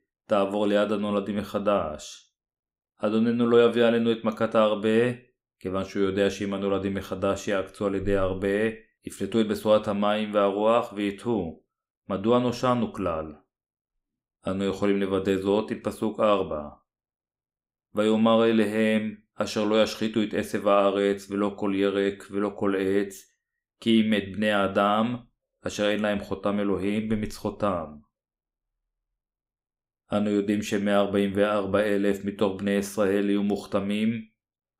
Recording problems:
none

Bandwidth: 15.5 kHz